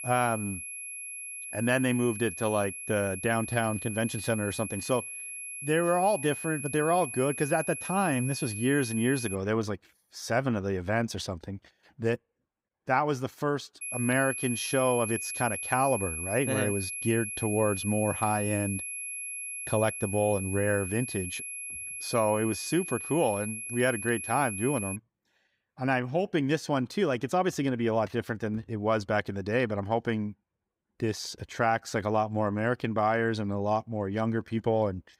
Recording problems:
high-pitched whine; loud; until 9.5 s and from 14 to 25 s; 11 kHz, 6 dB below the speech

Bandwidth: 15.5 kHz